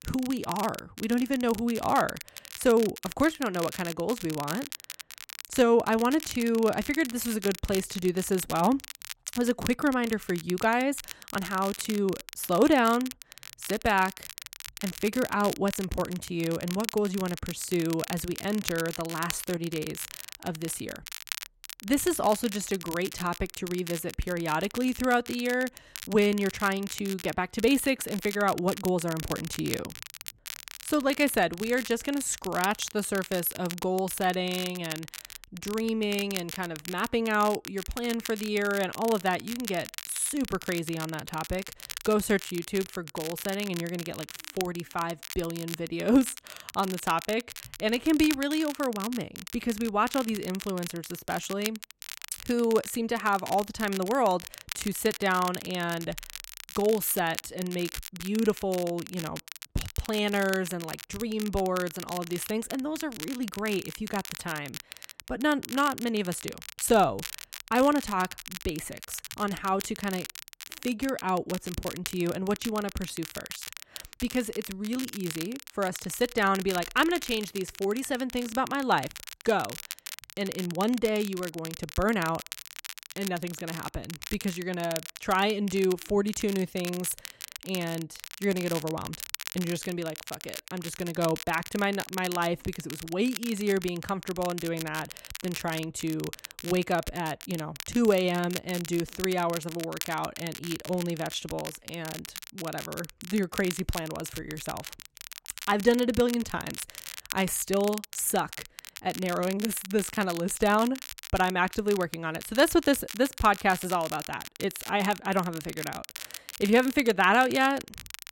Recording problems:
crackle, like an old record; noticeable; 10 dB below the speech

